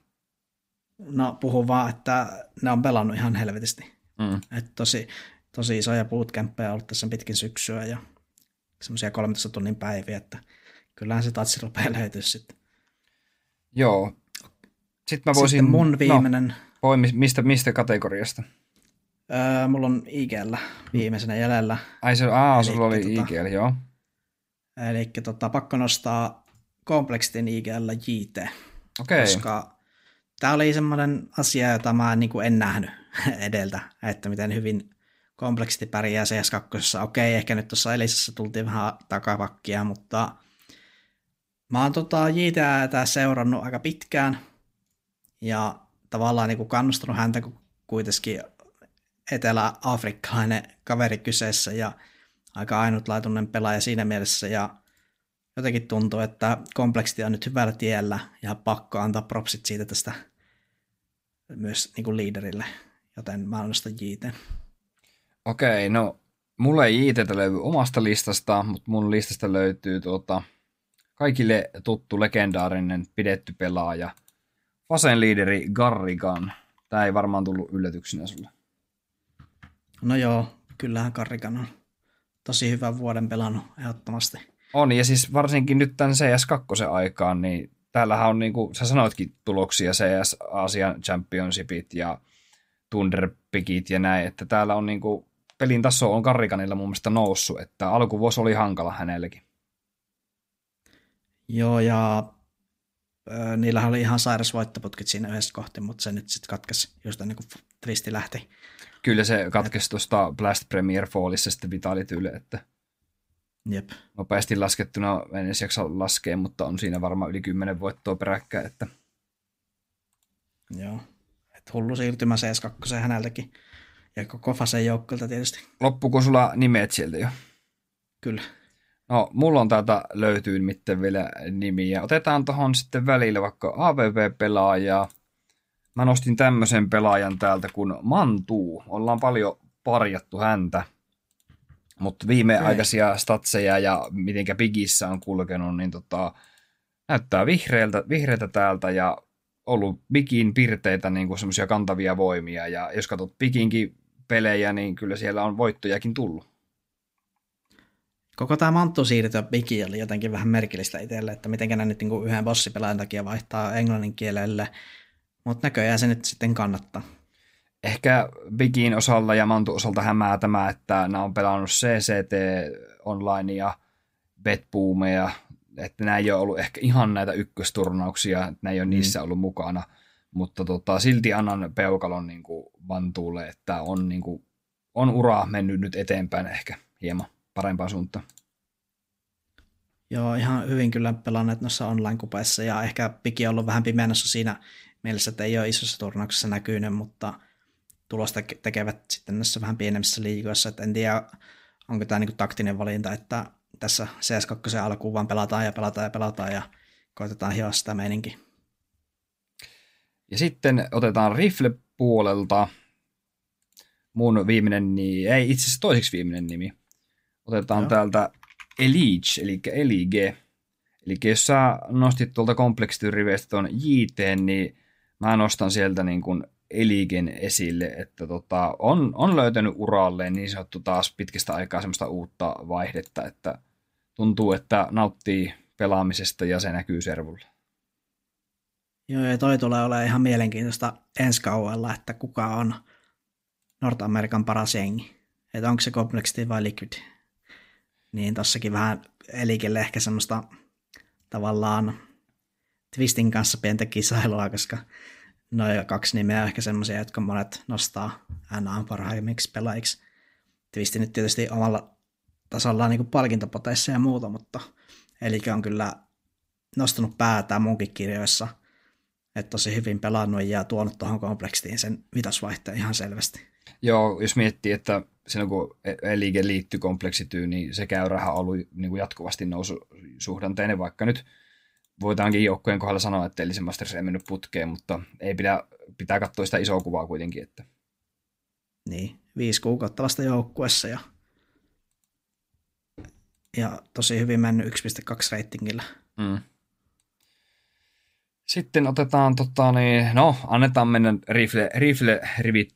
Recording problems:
none

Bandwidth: 15.5 kHz